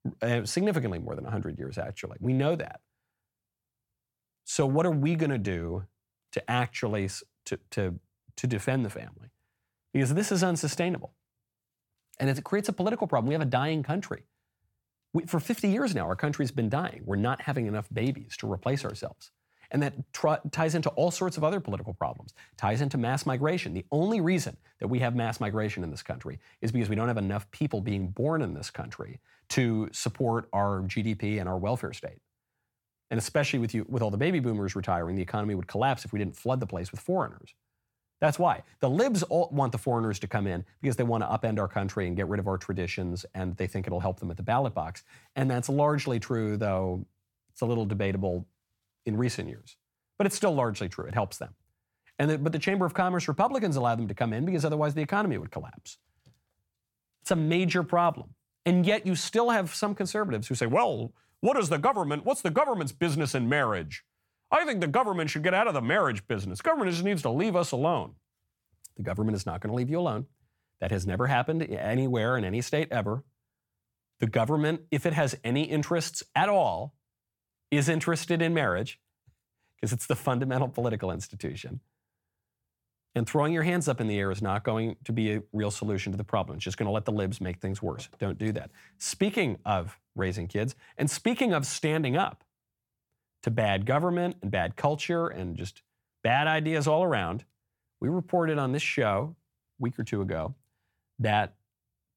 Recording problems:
none

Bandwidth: 17.5 kHz